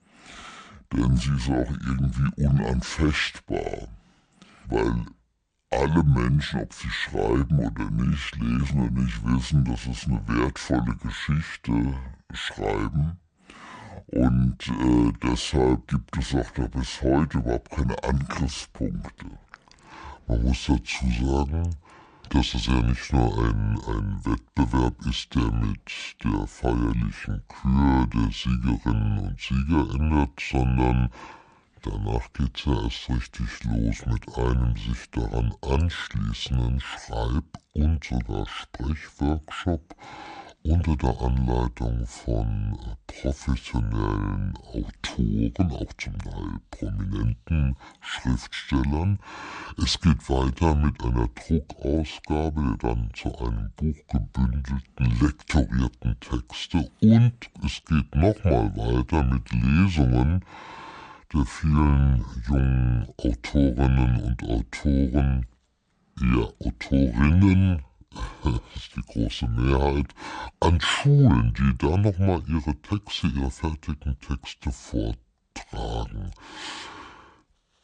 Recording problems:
wrong speed and pitch; too slow and too low; 0.6 times normal speed

